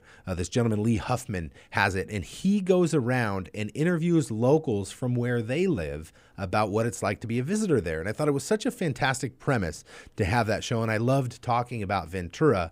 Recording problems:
none

